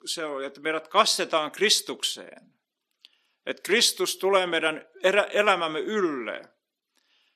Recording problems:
thin; somewhat; fading below 300 Hz

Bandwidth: 14.5 kHz